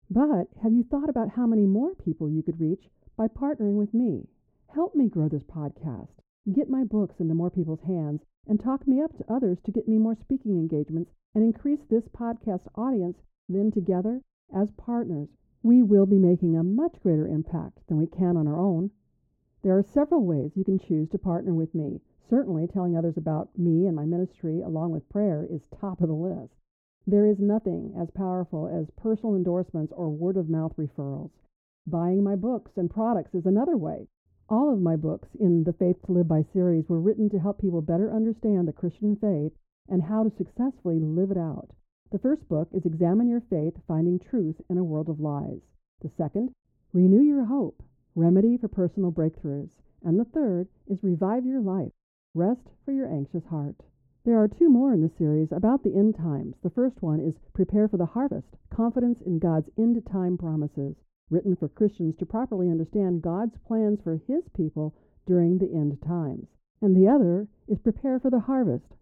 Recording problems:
muffled; very; fading above 1.5 kHz

